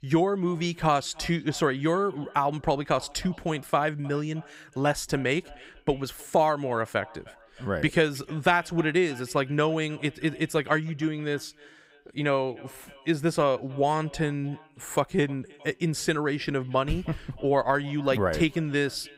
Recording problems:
echo of what is said; faint; throughout; 310 ms later, 25 dB below the speech

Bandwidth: 15.5 kHz